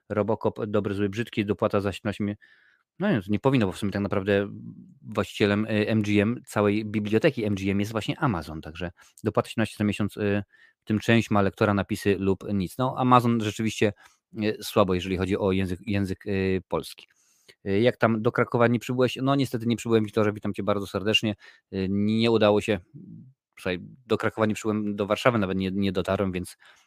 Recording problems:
none

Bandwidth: 15 kHz